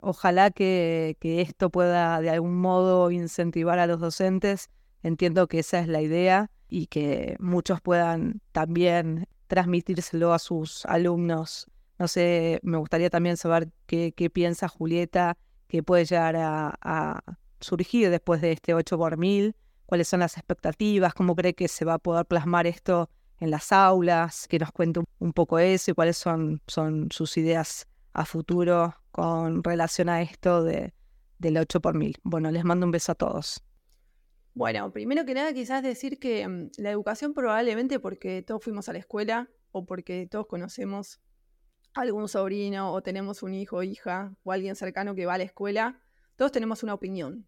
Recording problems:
none

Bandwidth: 17 kHz